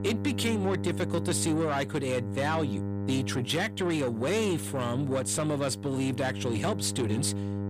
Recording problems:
distortion; slight; 10 dB below the speech
electrical hum; noticeable; throughout; 50 Hz, 10 dB below the speech

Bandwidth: 15 kHz